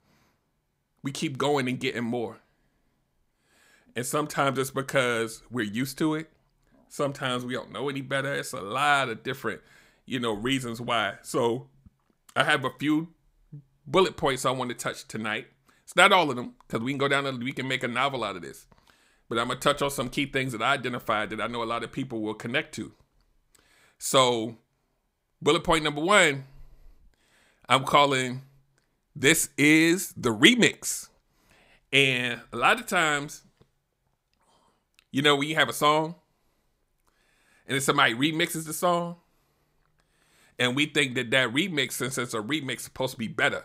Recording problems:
none

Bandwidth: 15.5 kHz